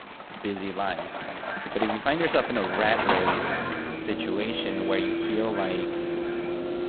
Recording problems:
phone-call audio; poor line; nothing above 4 kHz
echo of what is said; strong; throughout; 310 ms later, 8 dB below the speech
traffic noise; loud; throughout; 1 dB below the speech

